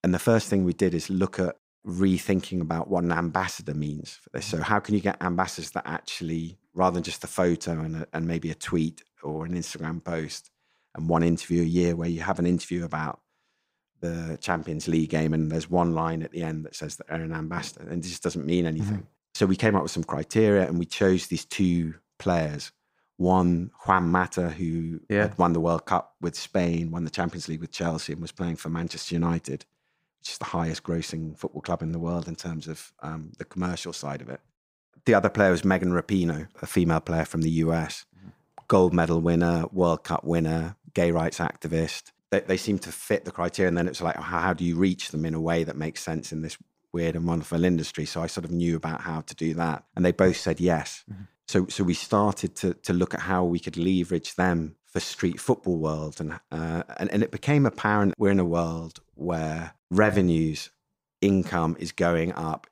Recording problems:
none

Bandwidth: 15.5 kHz